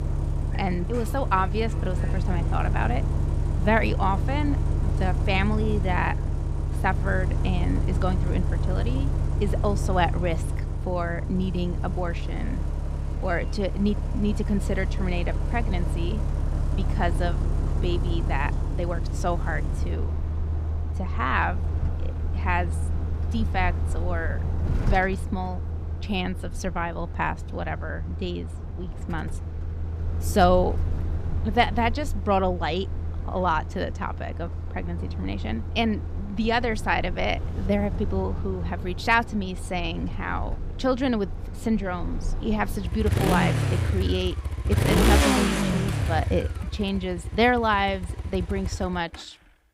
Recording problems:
traffic noise; loud; throughout; 1 dB below the speech

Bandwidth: 15.5 kHz